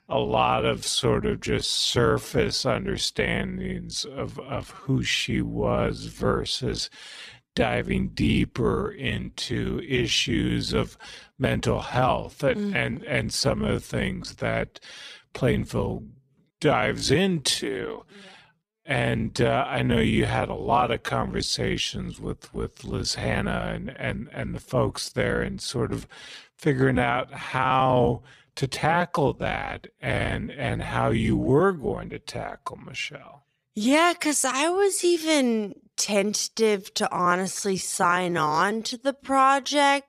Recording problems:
wrong speed, natural pitch; too slow; 0.6 times normal speed

